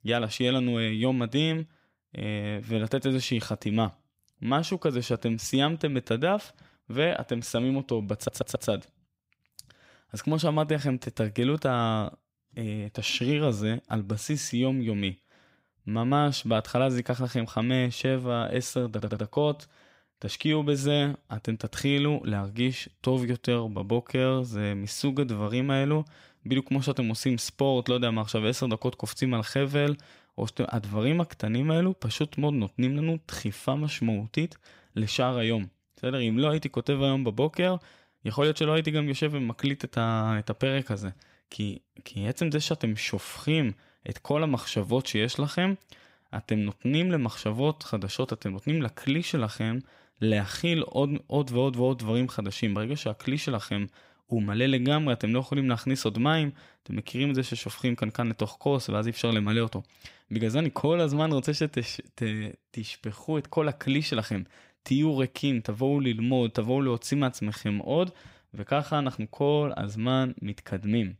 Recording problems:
audio stuttering; at 8 s and at 19 s

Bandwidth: 15.5 kHz